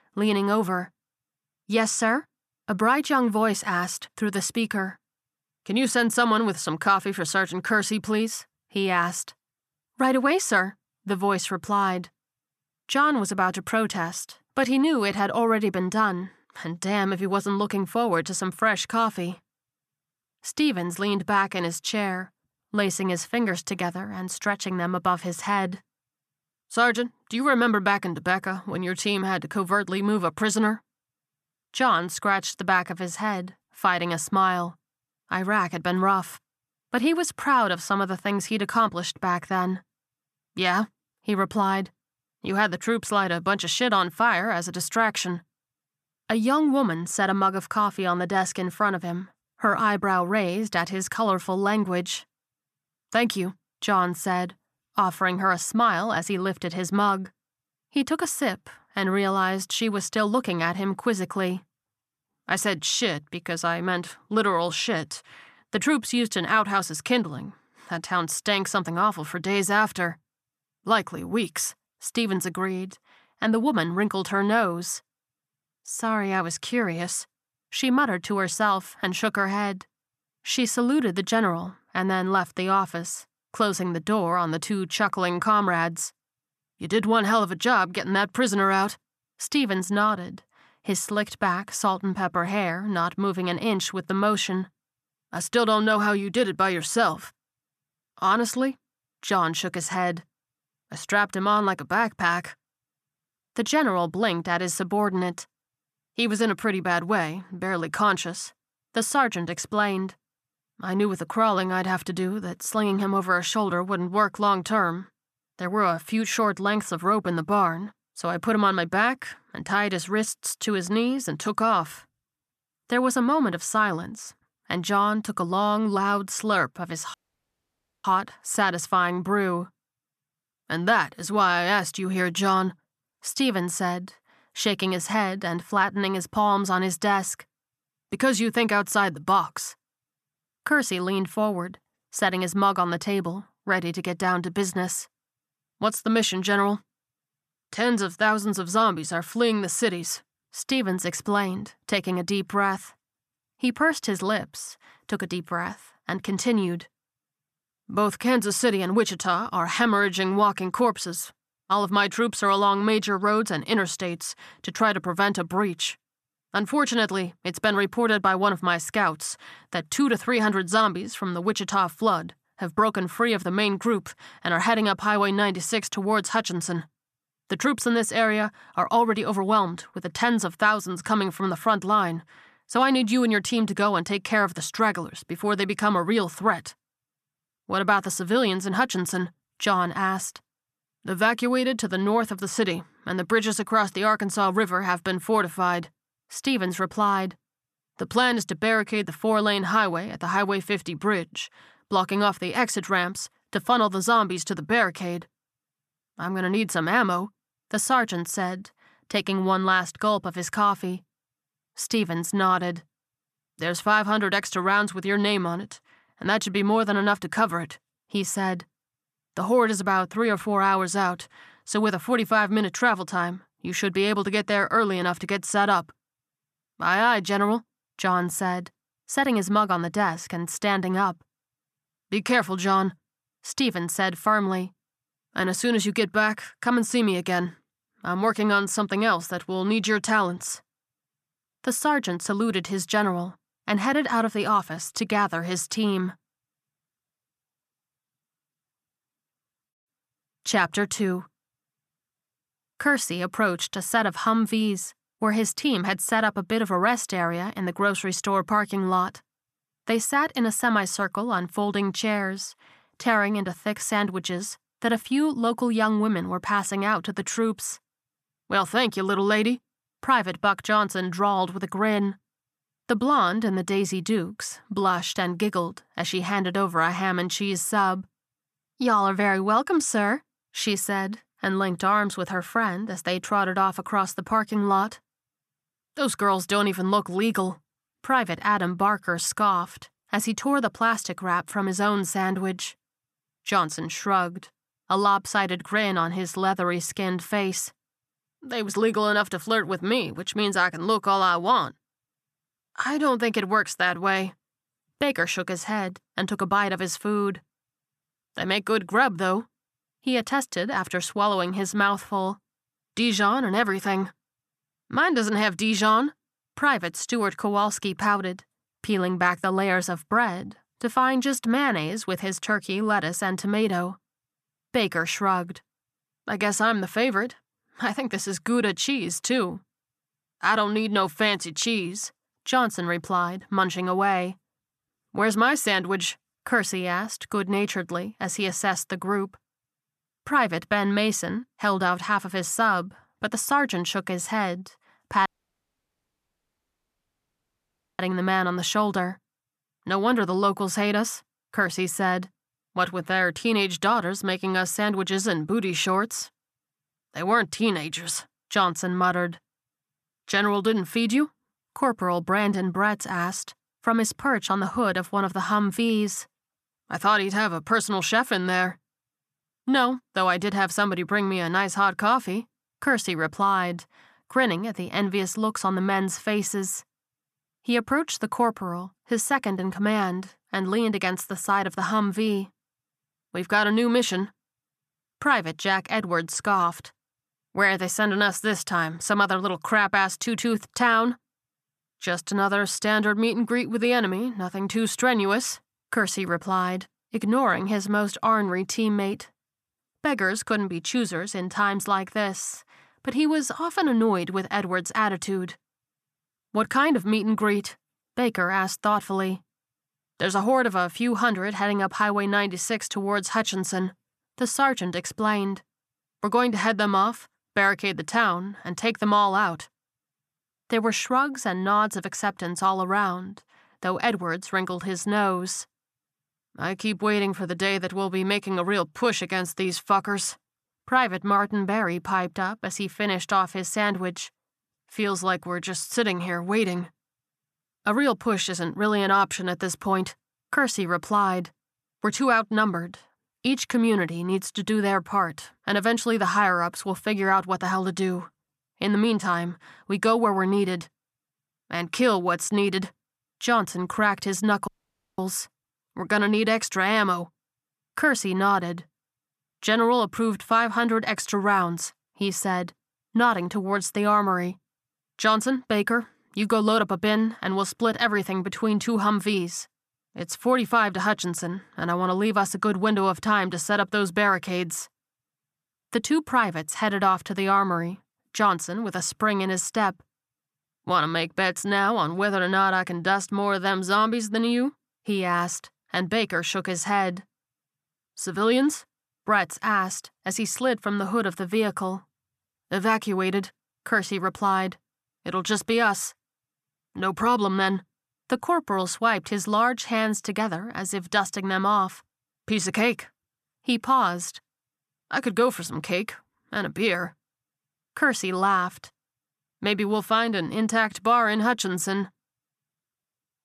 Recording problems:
audio cutting out; at 2:07 for 1 s, at 5:45 for 2.5 s and at 7:35 for 0.5 s

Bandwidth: 14 kHz